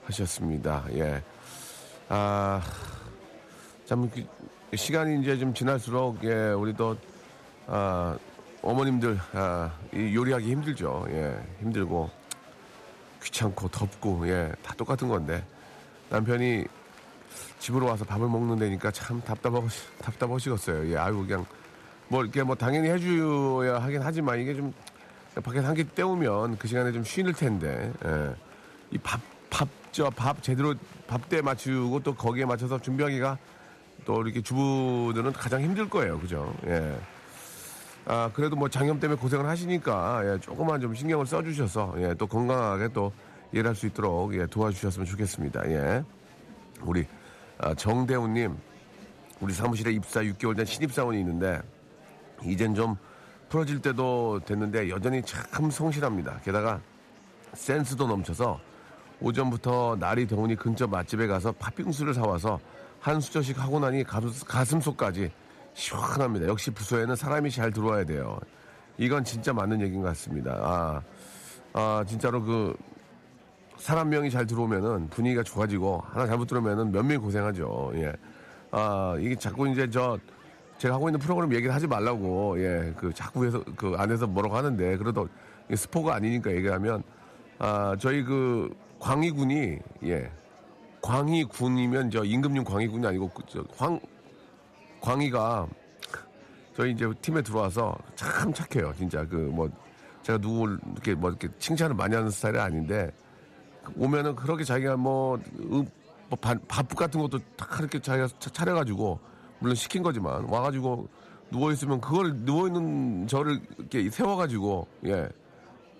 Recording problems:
murmuring crowd; faint; throughout; 25 dB below the speech

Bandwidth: 14 kHz